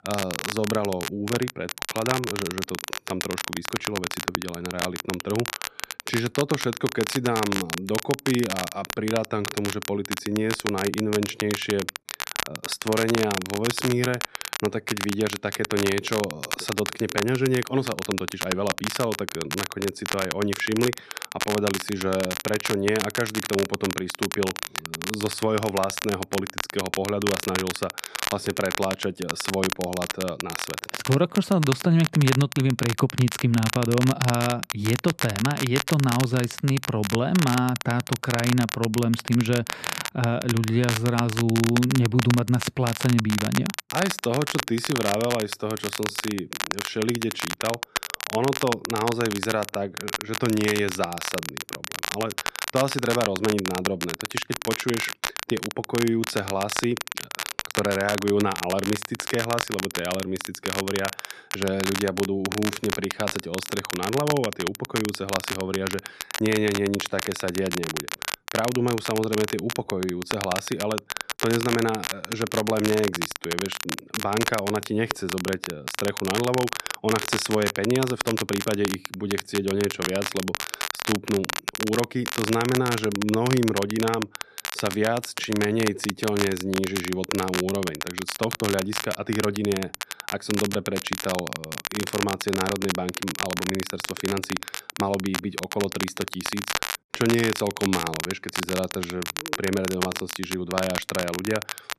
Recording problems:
crackle, like an old record; loud; 4 dB below the speech

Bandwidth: 13.5 kHz